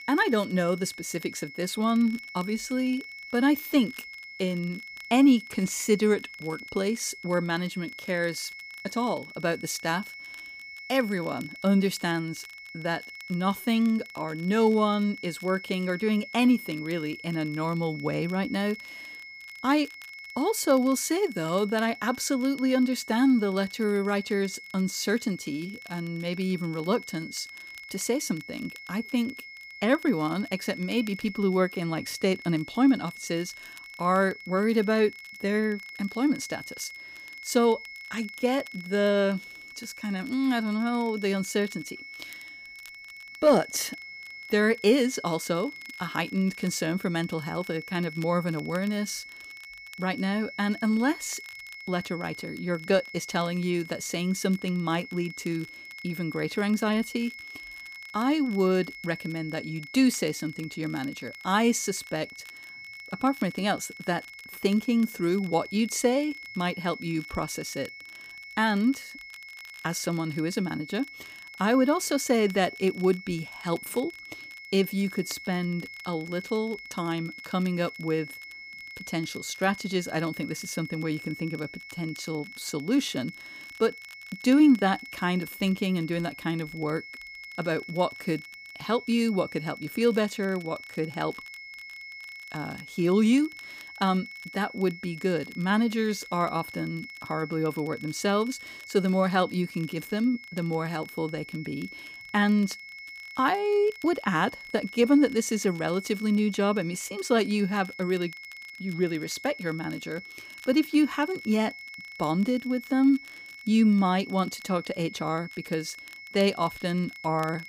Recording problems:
high-pitched whine; noticeable; throughout; 2 kHz, 15 dB below the speech
crackle, like an old record; faint; 25 dB below the speech

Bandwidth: 15 kHz